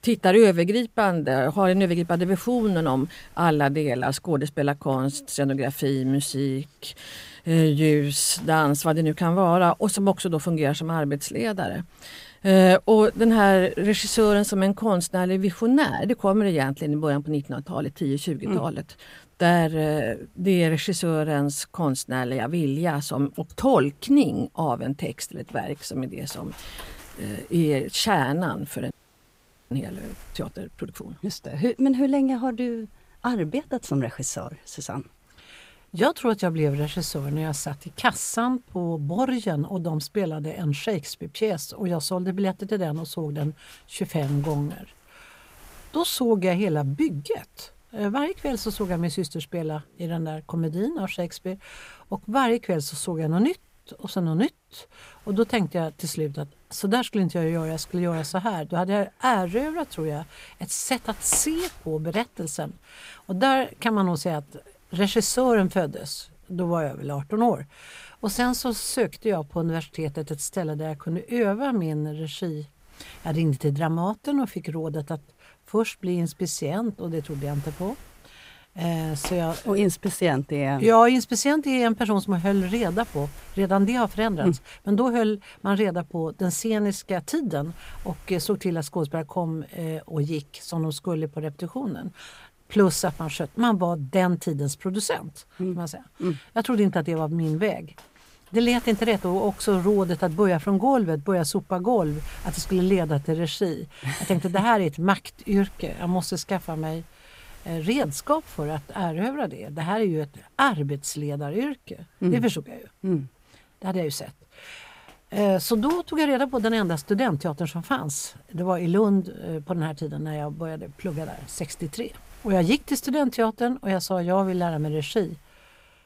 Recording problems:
wind noise on the microphone; occasional gusts; 25 dB below the speech
audio freezing; at 29 s for 1 s

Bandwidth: 15.5 kHz